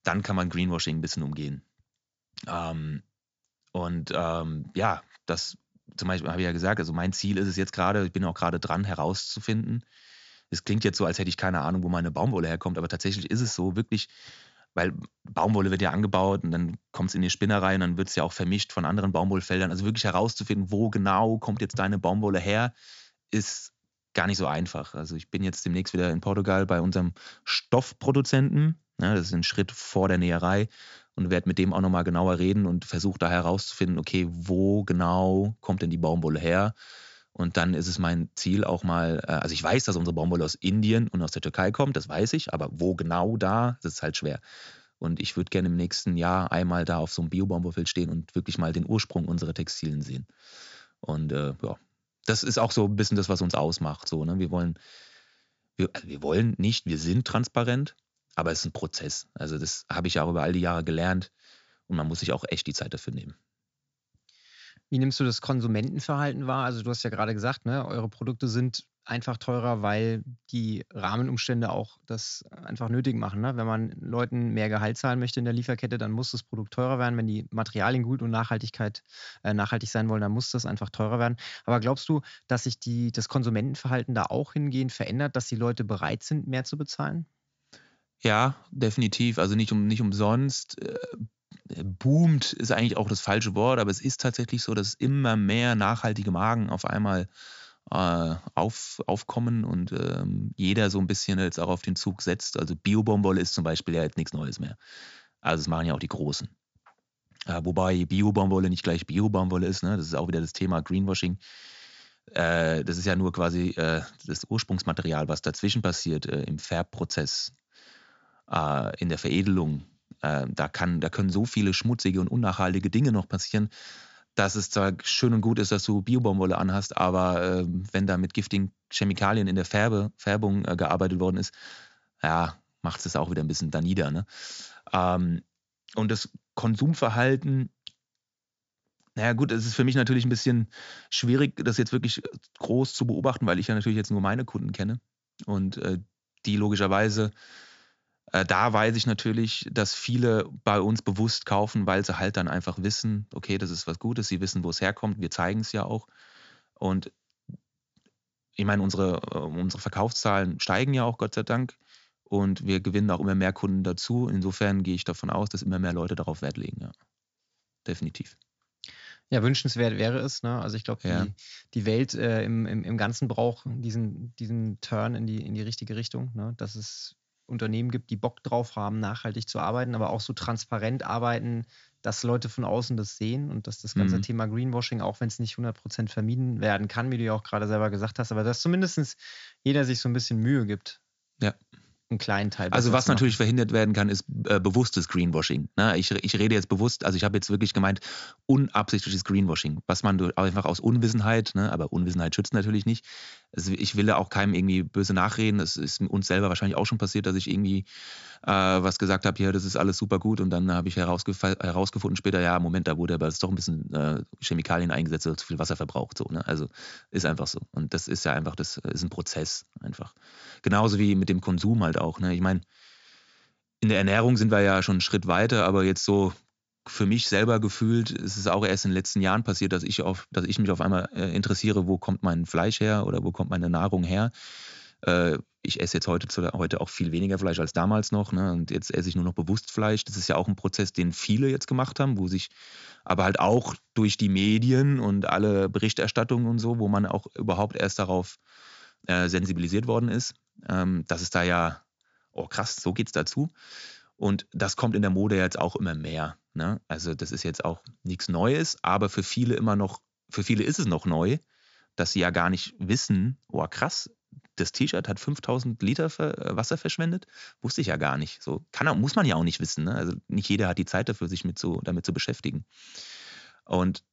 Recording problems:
high frequencies cut off; noticeable; nothing above 7.5 kHz

